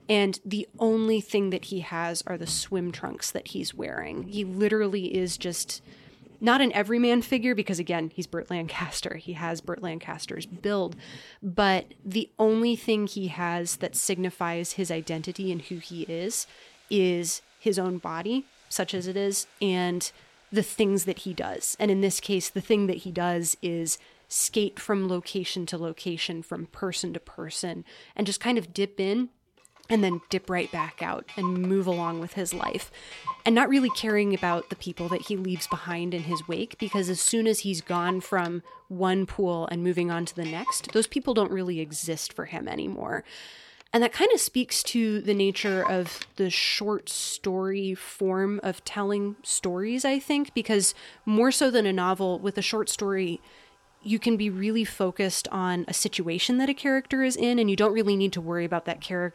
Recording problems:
household noises; noticeable; throughout; 15 dB below the speech

